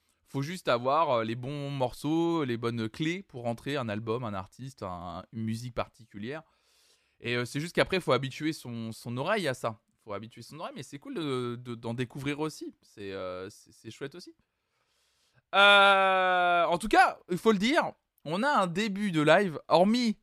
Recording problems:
none

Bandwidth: 14.5 kHz